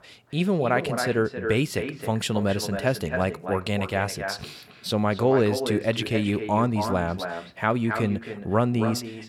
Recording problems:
echo of what is said; strong; throughout; 270 ms later, 7 dB below the speech

